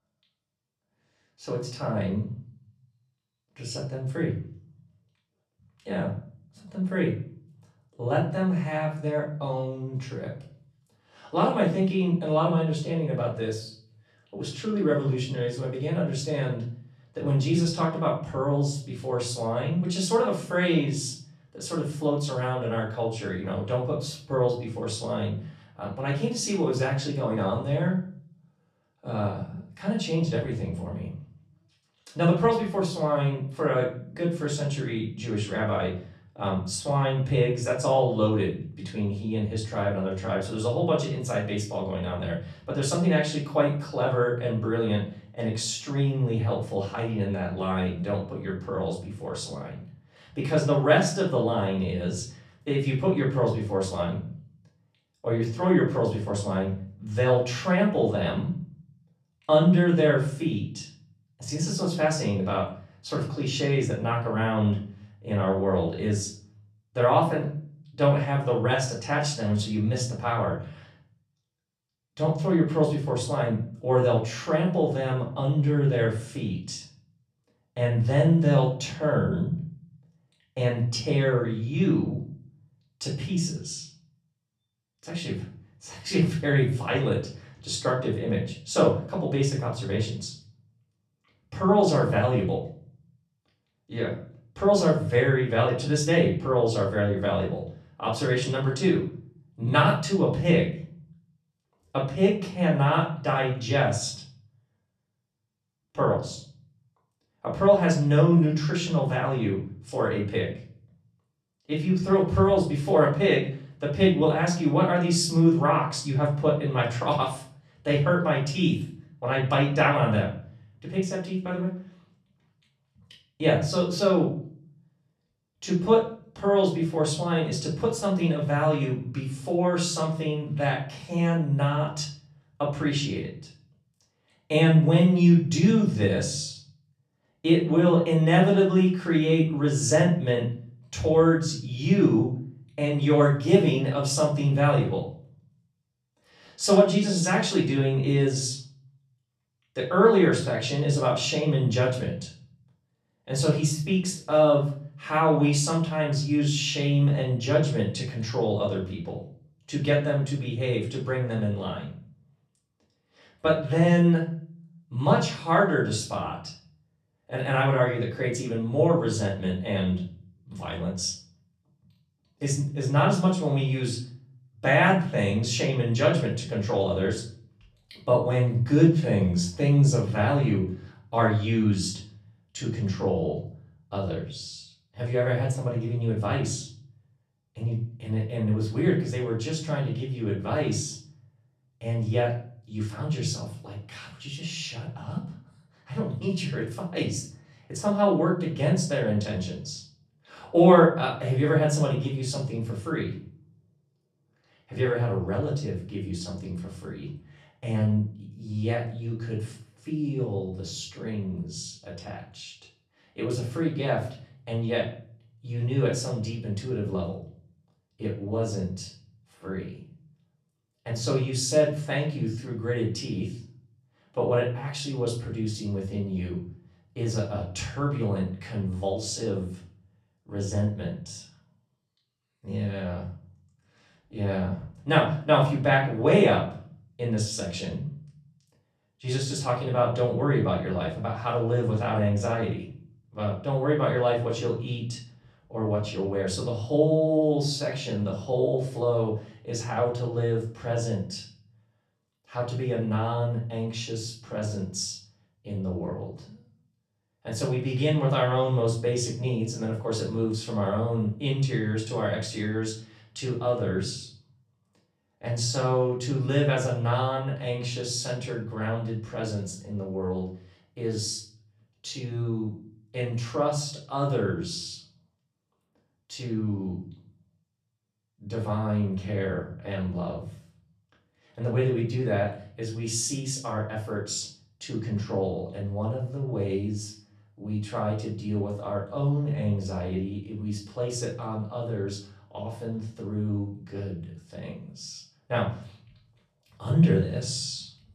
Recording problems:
off-mic speech; far
room echo; slight; dies away in 0.5 s

